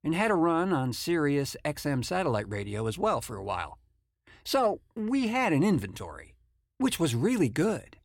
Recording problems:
none

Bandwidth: 17 kHz